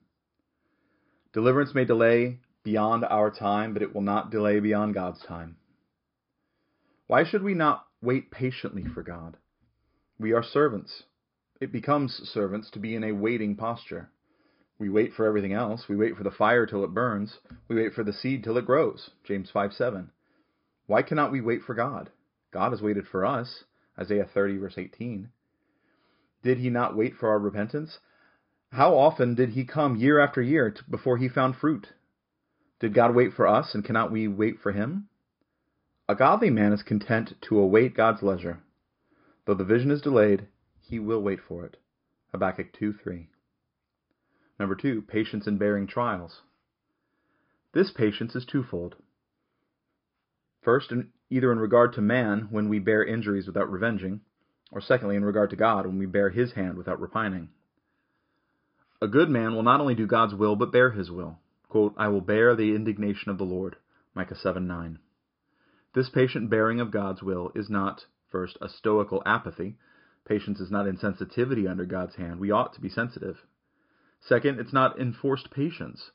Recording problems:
high frequencies cut off; noticeable; nothing above 5.5 kHz

